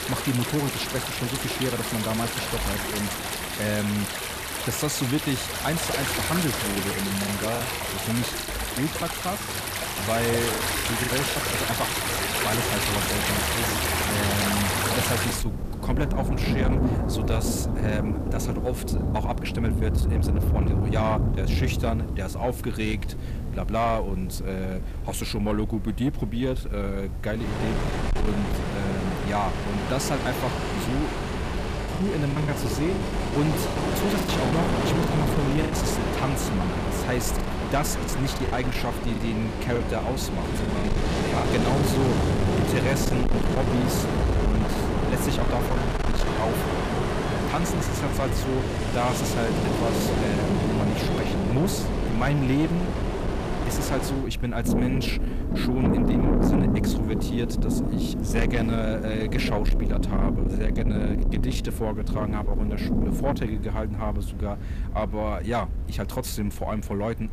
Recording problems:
distortion; slight; 10 dB below the speech
rain or running water; very loud; throughout; 2 dB above the speech
low rumble; noticeable; from 23 s on; 15 dB below the speech
murmuring crowd; faint; throughout; 25 dB below the speech
choppy; very; from 6.5 to 11 s, from 32 to 36 s and from 37 to 41 s; 10% of the speech affected

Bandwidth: 14.5 kHz